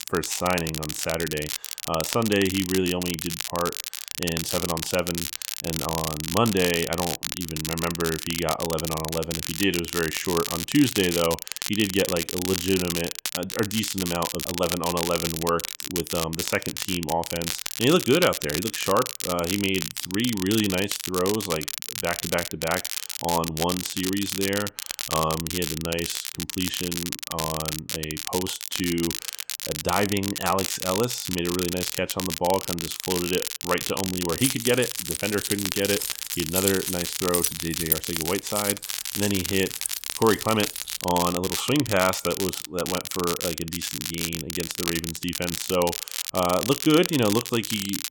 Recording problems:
crackle, like an old record; loud; 3 dB below the speech
jangling keys; loud; from 34 to 41 s; peak 2 dB above the speech

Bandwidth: 17 kHz